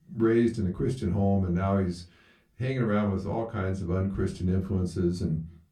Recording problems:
off-mic speech; far
room echo; very slight; dies away in 0.2 s

